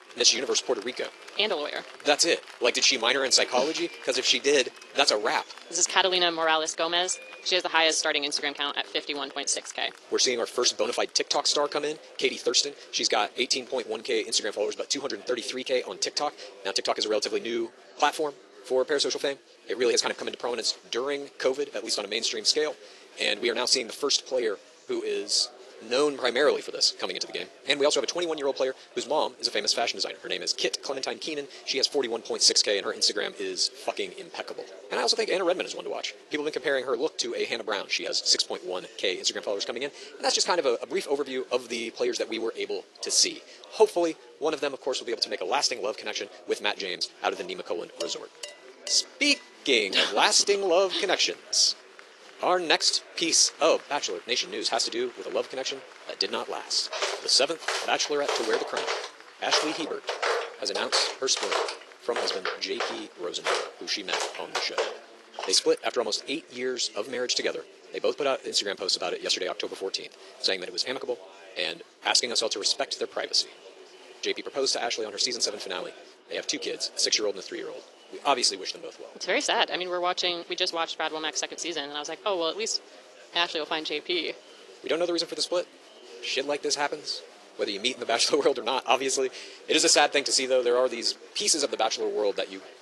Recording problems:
wrong speed, natural pitch; too fast; 1.5 times normal speed
thin; somewhat; fading below 350 Hz
garbled, watery; slightly
murmuring crowd; faint; throughout; 20 dB below the speech
clattering dishes; faint; from 48 to 49 s; peak 10 dB below the speech
footsteps; noticeable; from 57 s to 1:06; peak 1 dB below the speech

